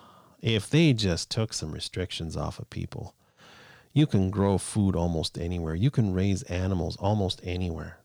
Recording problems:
none

